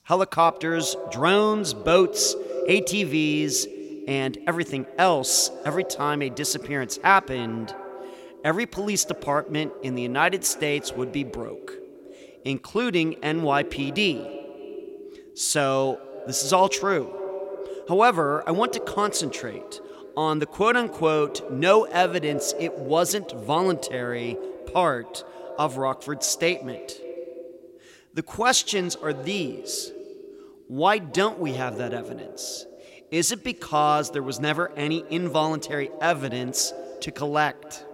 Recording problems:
echo of what is said; noticeable; throughout; 280 ms later, 15 dB below the speech

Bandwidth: 16 kHz